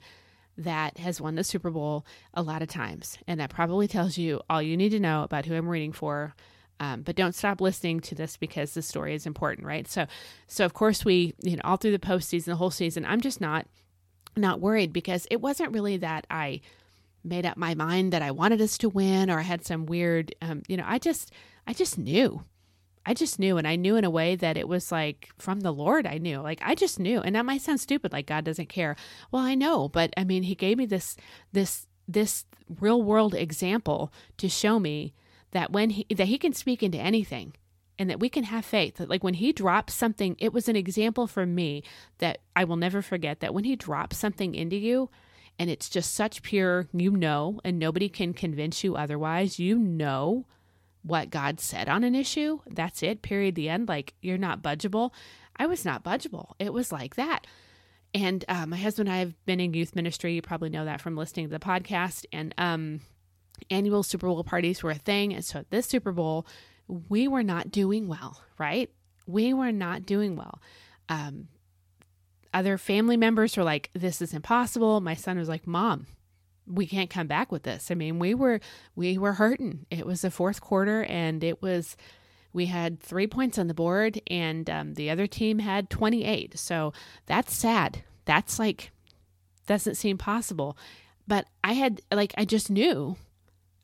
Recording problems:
none

